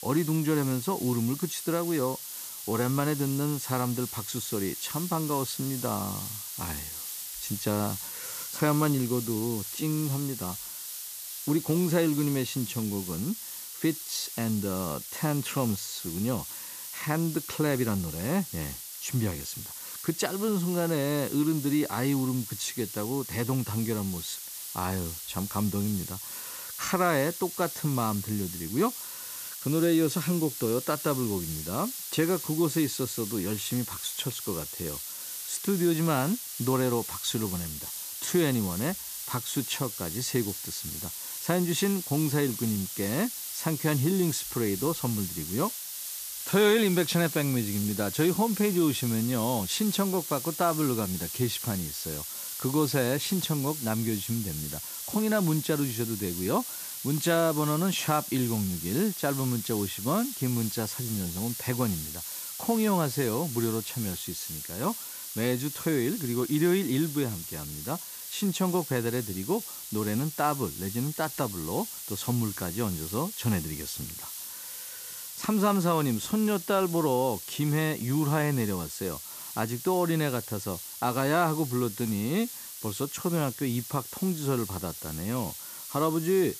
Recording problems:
hiss; loud; throughout; 6 dB below the speech

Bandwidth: 14.5 kHz